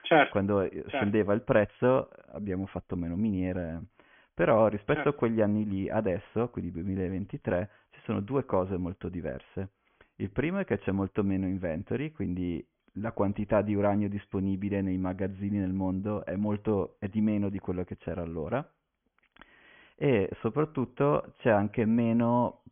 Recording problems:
high frequencies cut off; severe; nothing above 3.5 kHz

